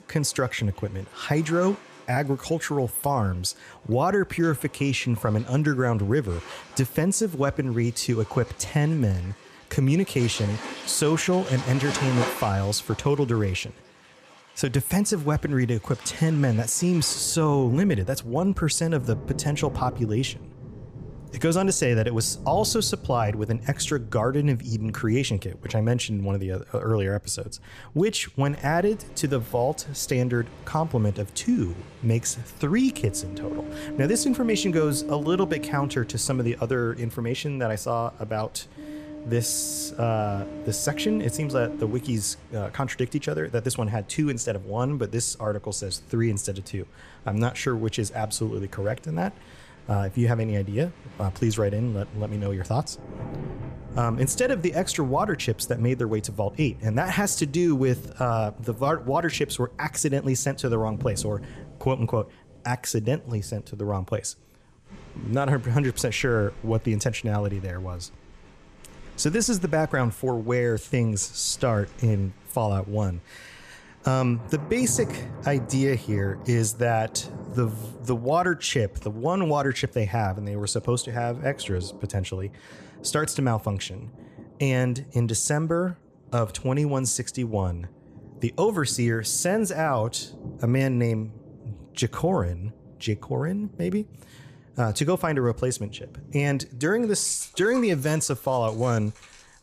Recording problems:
rain or running water; noticeable; throughout; 15 dB below the speech

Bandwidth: 14.5 kHz